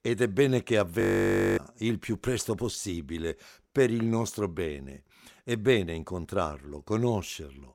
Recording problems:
audio freezing; at 1 s for 0.5 s

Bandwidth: 16.5 kHz